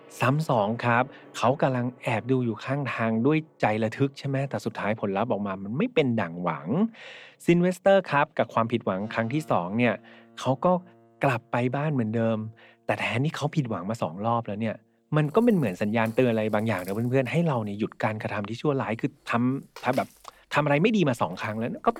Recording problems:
background music; faint; throughout; 25 dB below the speech

